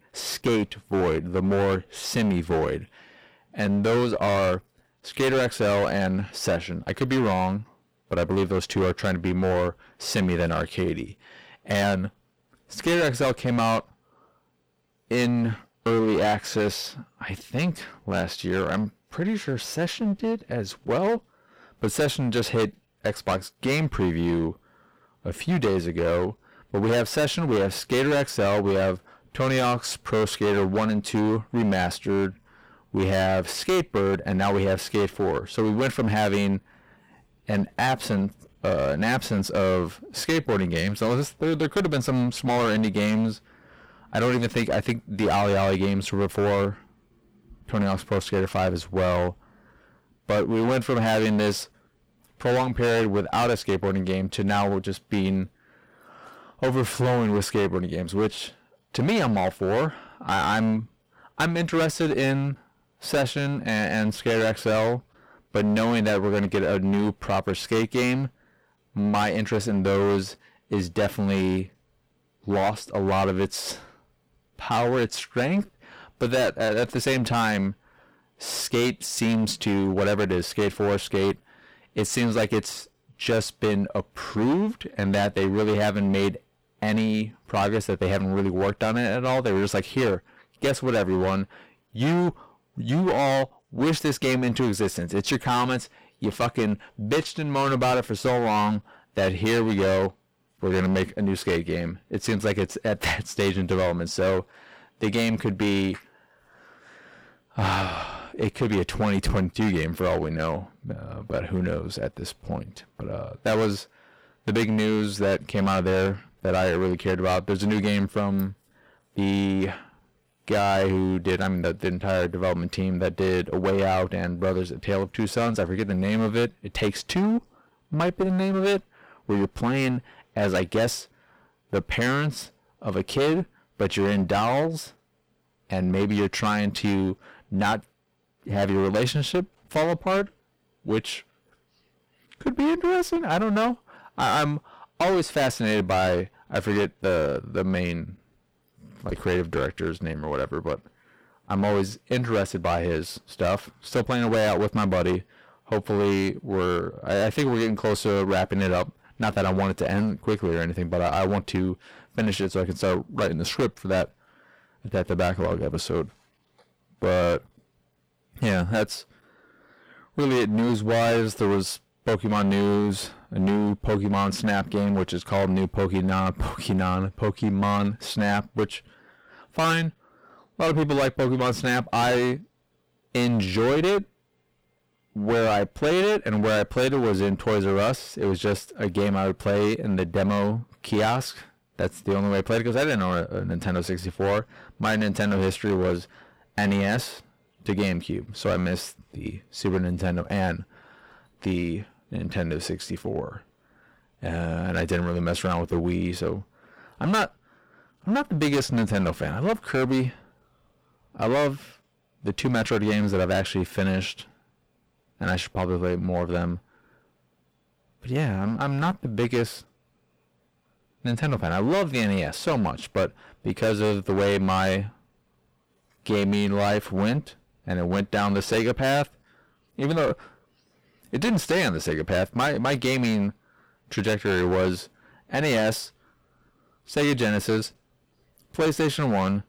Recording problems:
distortion; heavy; 16% of the sound clipped

